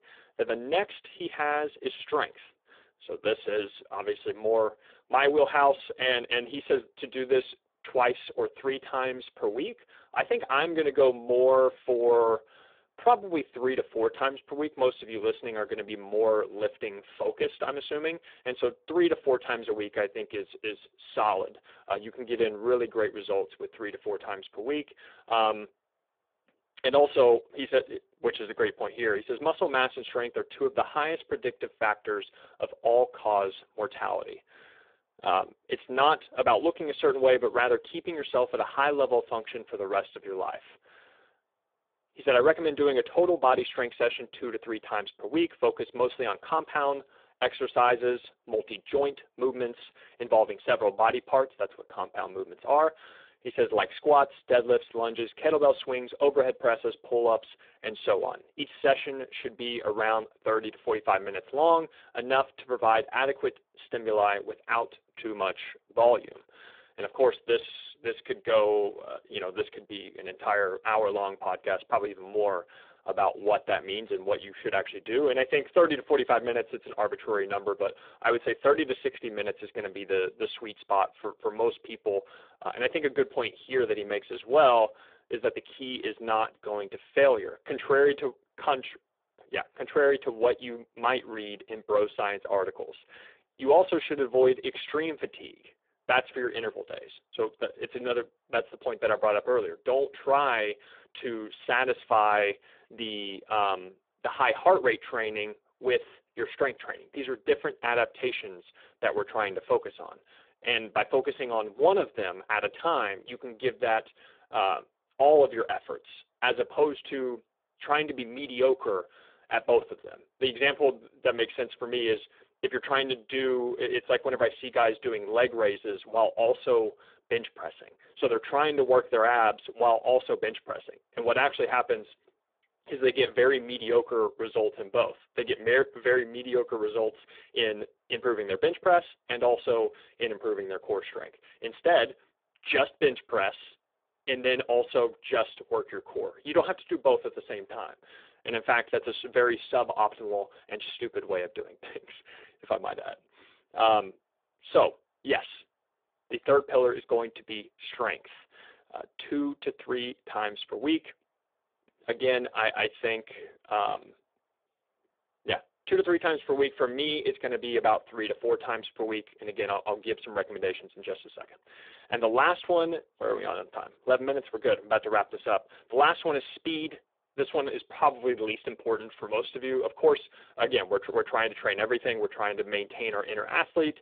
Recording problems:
phone-call audio; poor line

